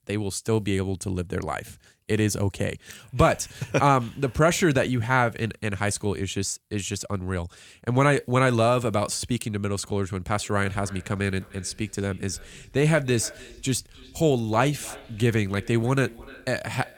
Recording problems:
echo of what is said; faint; from 10 s on; 300 ms later, 20 dB below the speech

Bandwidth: 18 kHz